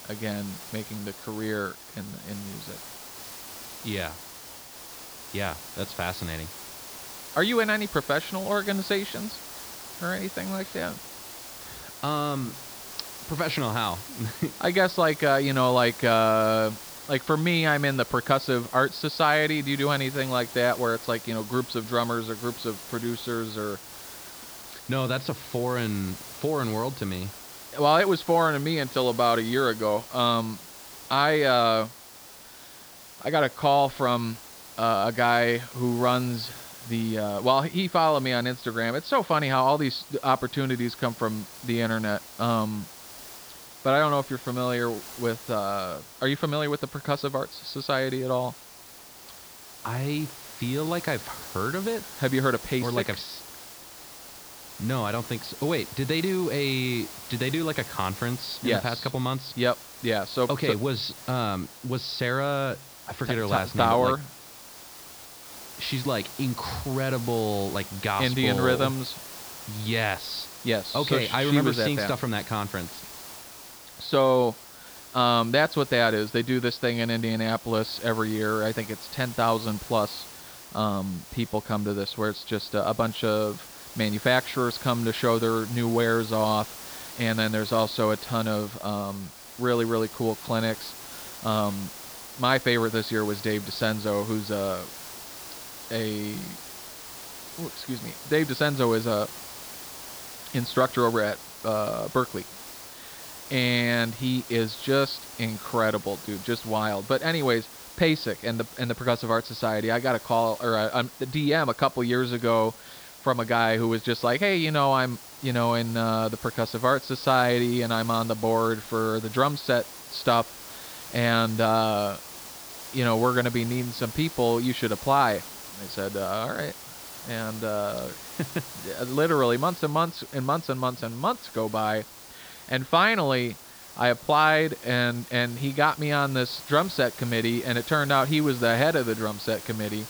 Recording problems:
high frequencies cut off; noticeable; nothing above 5.5 kHz
hiss; noticeable; throughout; 15 dB below the speech

